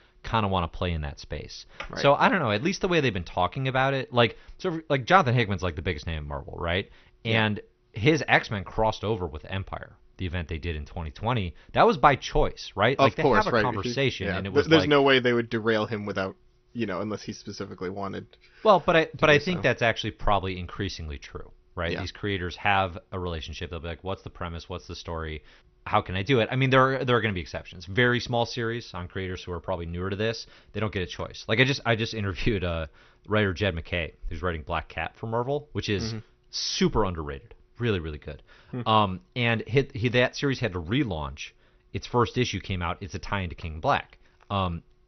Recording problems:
garbled, watery; slightly; nothing above 6 kHz

